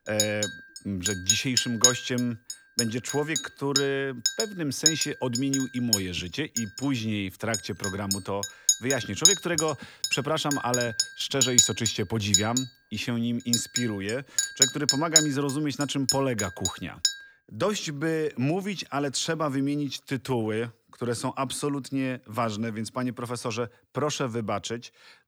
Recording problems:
household noises; very loud; until 17 s; 4 dB above the speech

